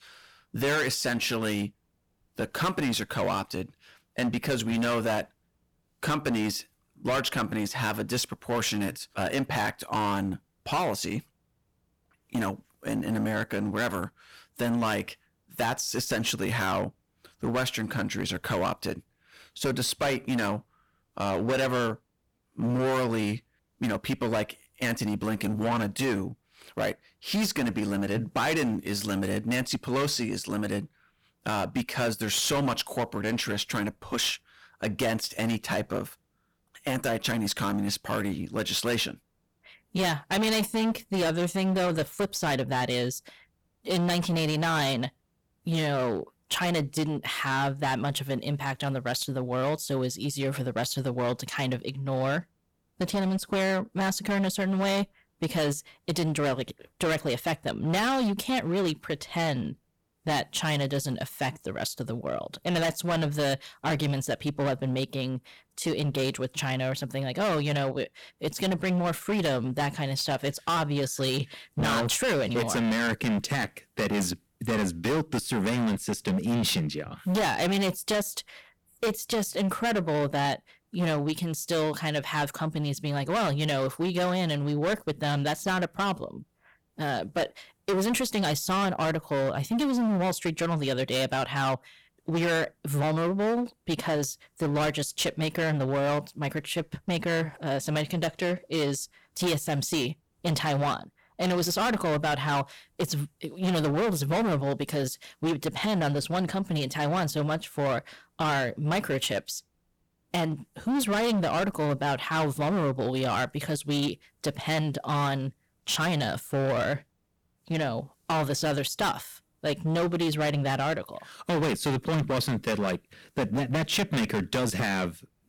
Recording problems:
distortion; heavy; 17% of the sound clipped

